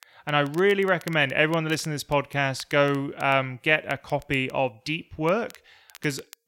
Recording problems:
crackle, like an old record; faint; 25 dB below the speech

